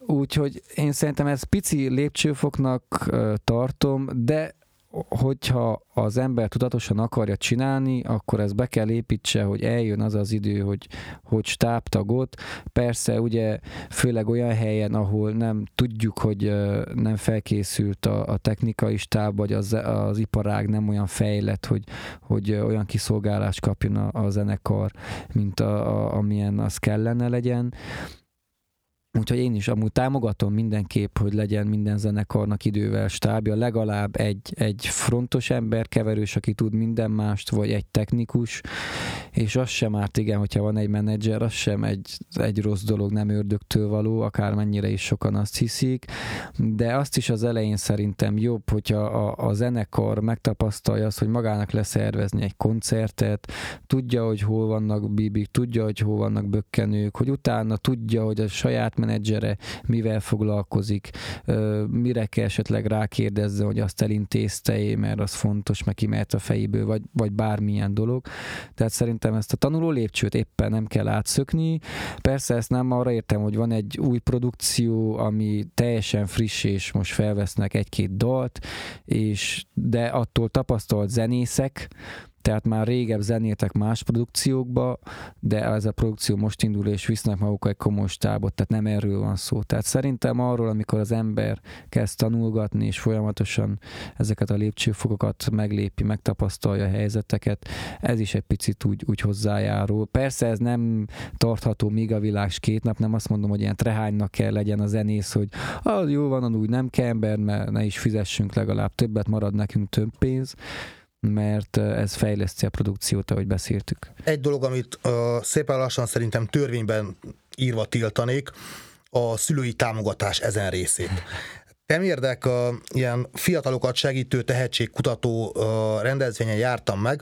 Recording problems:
squashed, flat; somewhat

